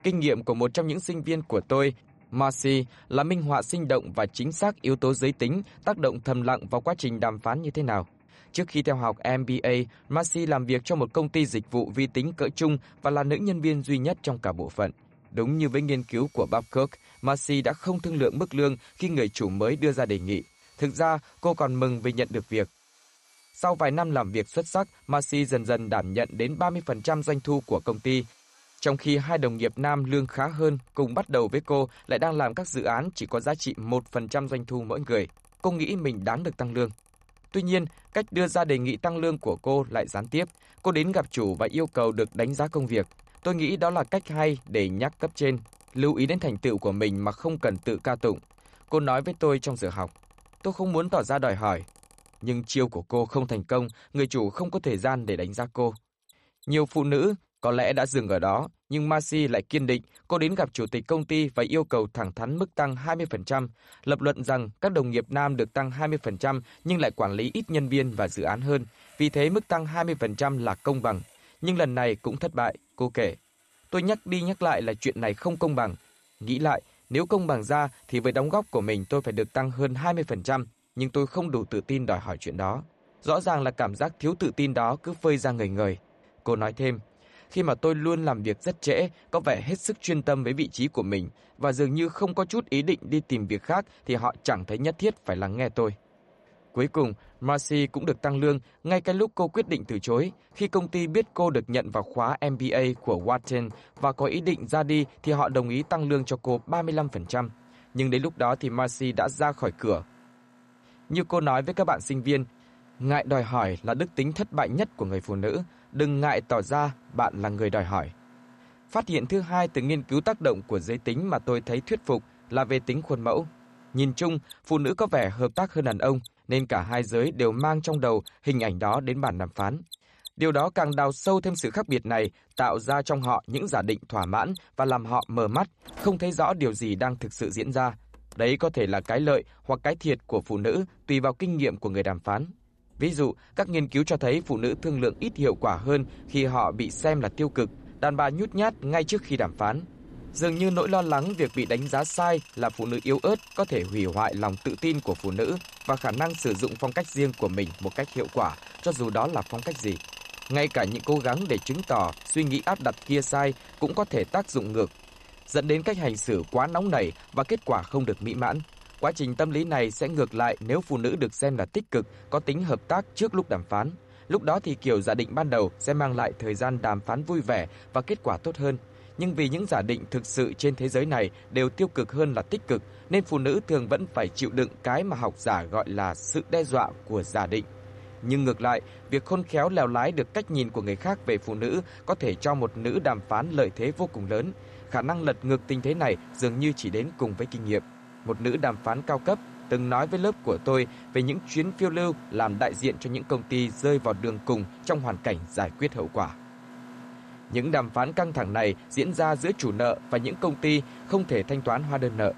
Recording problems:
machinery noise; faint; throughout; 20 dB below the speech

